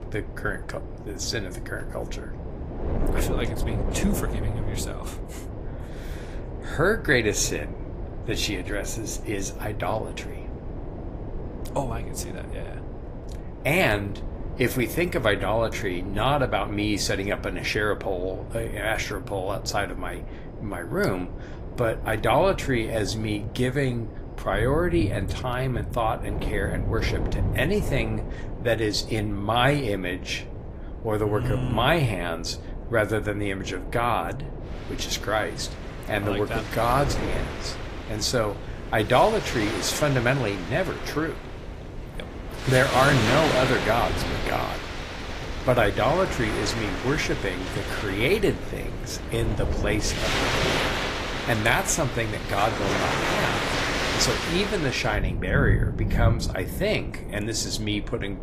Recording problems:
garbled, watery; slightly; nothing above 14.5 kHz
rain or running water; loud; throughout; 4 dB below the speech
wind noise on the microphone; occasional gusts; 15 dB below the speech

